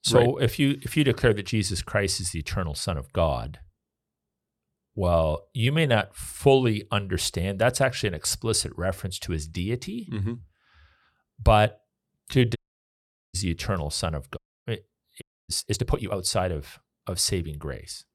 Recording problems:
uneven, jittery; strongly; from 5 to 16 s
audio cutting out; at 13 s for 1 s, at 14 s and at 15 s

